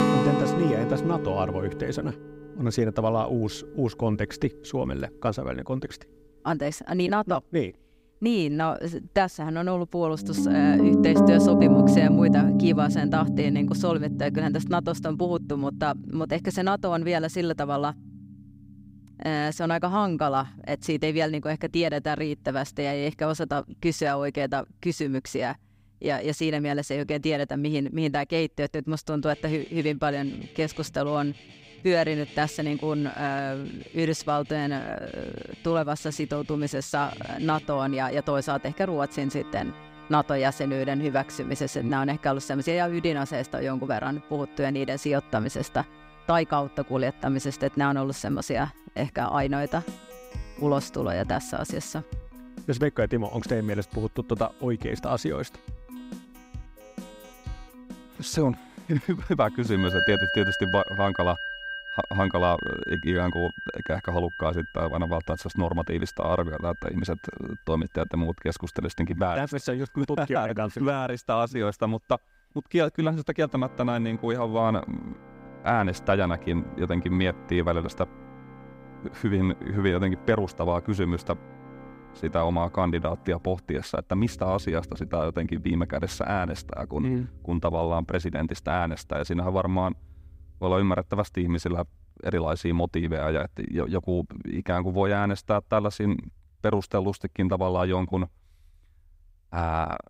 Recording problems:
background music; very loud; throughout; 1 dB above the speech

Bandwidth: 15.5 kHz